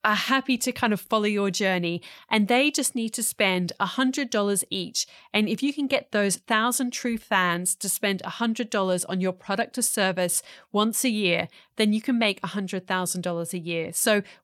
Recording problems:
none

